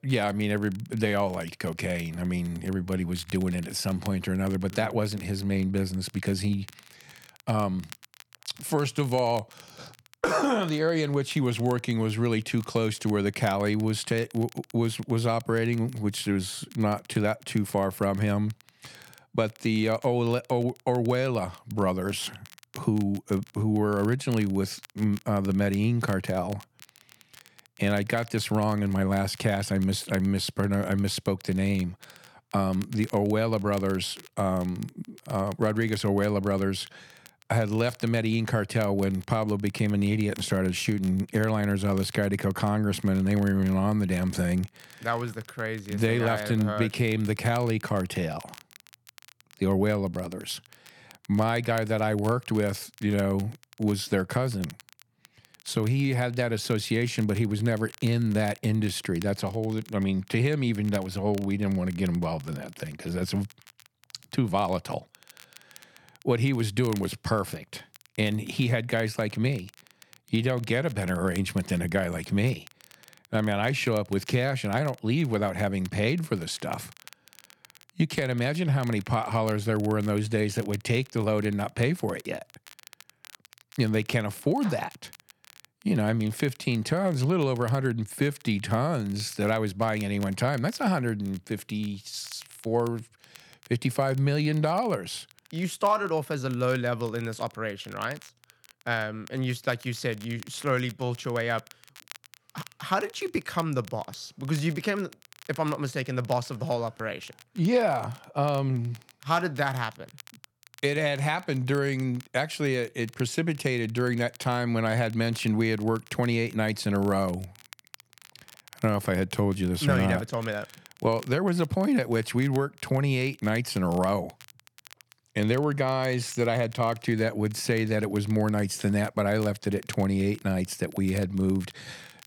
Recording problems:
crackle, like an old record; faint; 25 dB below the speech

